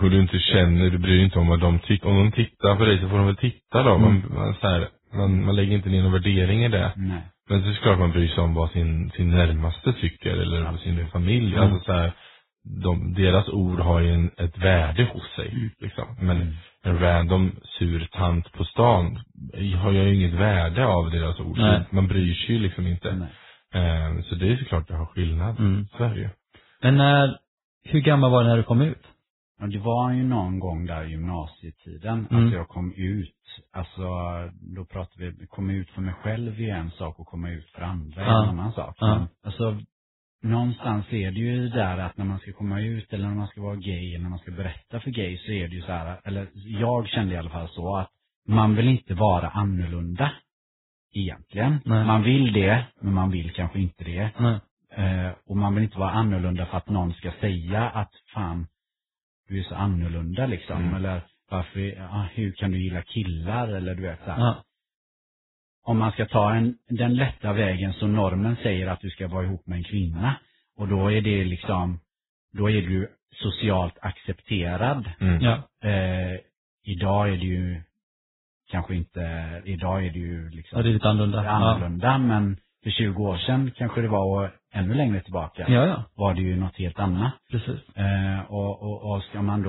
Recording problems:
garbled, watery; badly; nothing above 4 kHz
abrupt cut into speech; at the start and the end

